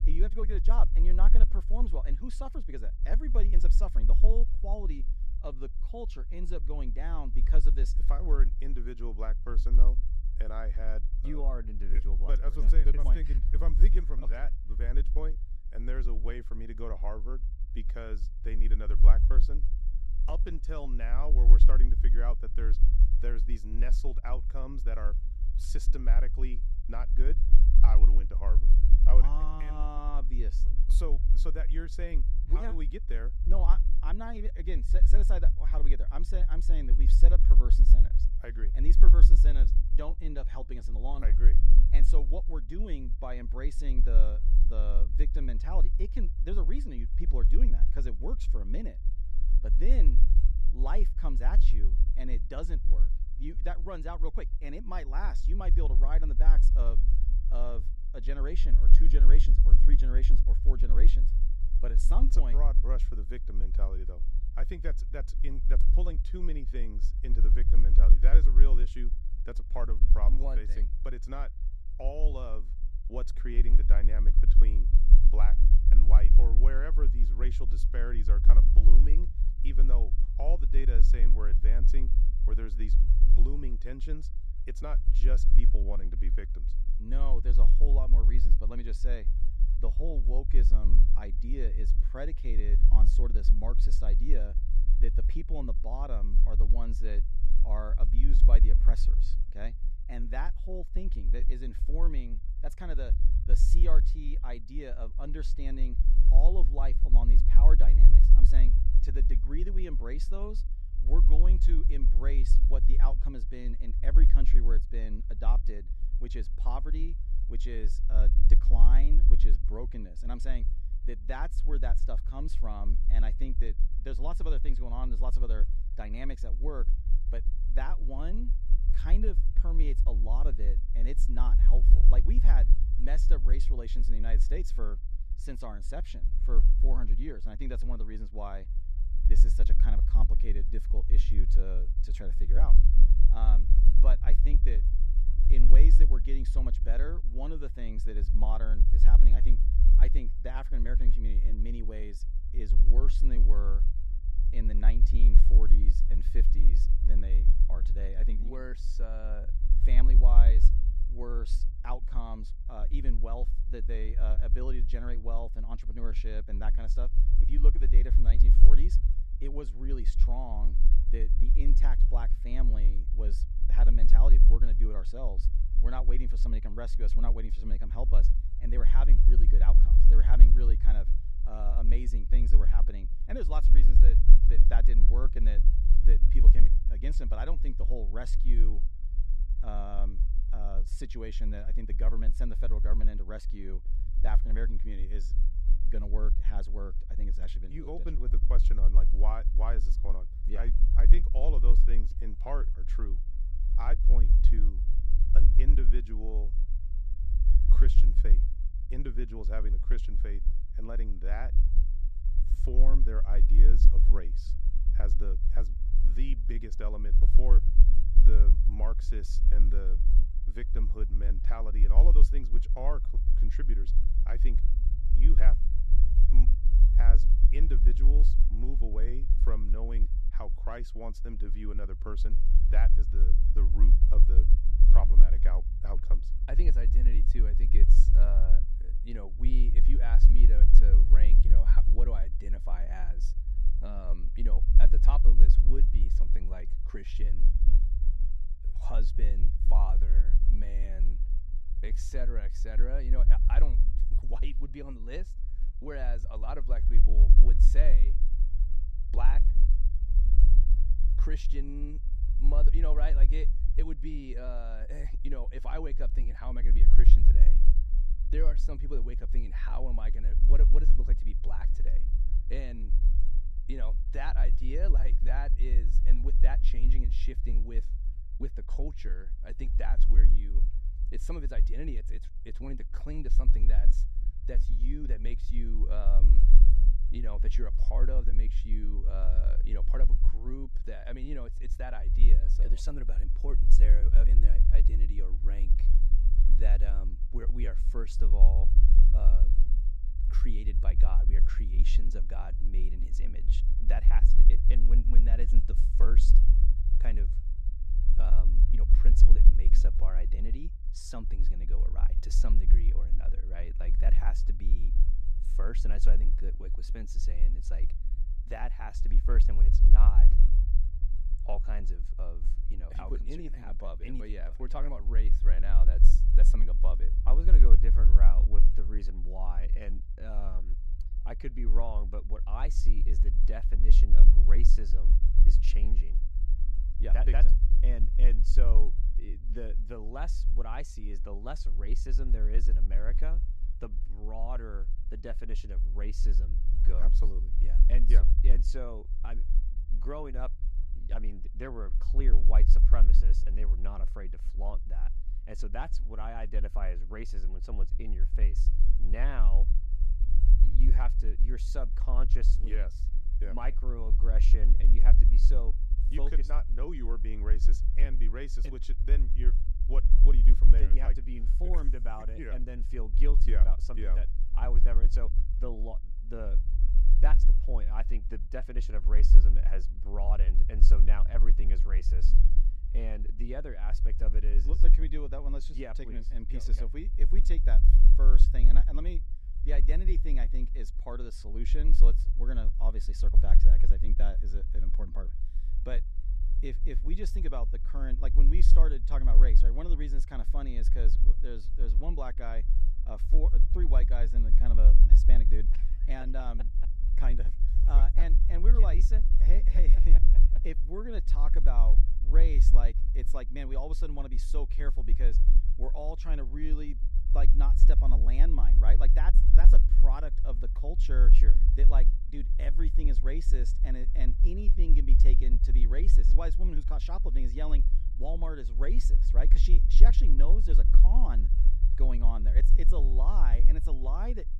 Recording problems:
low rumble; loud; throughout; 9 dB below the speech

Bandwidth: 14.5 kHz